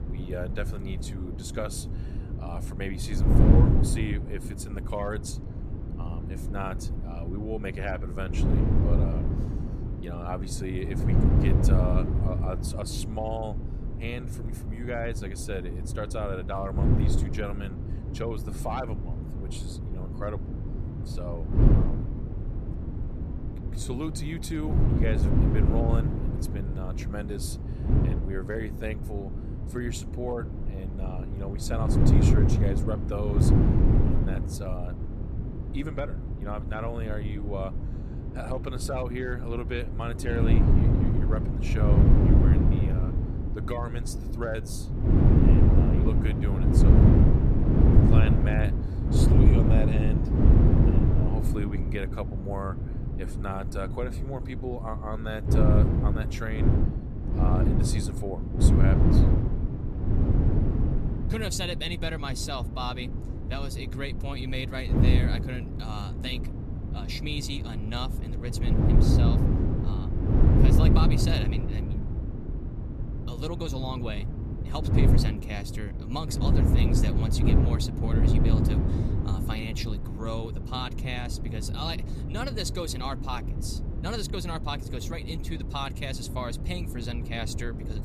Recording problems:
wind noise on the microphone; heavy; as loud as the speech

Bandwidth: 14.5 kHz